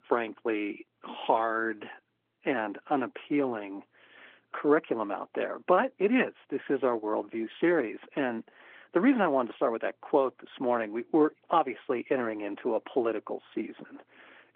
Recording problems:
phone-call audio
garbled, watery; slightly

